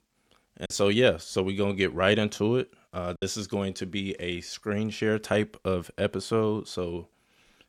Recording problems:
choppy; occasionally; at 0.5 s and at 3 s; 2% of the speech affected

